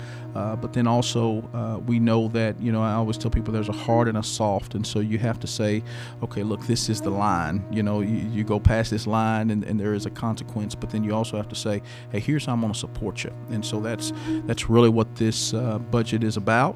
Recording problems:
electrical hum; noticeable; throughout; 60 Hz, 15 dB below the speech

